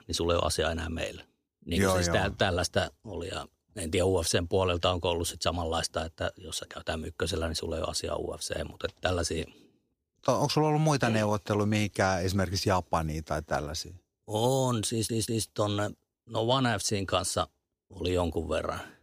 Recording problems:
audio stuttering; at 15 s

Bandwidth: 15 kHz